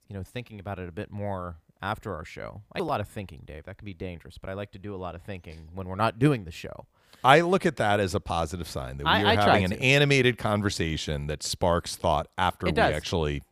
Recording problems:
none

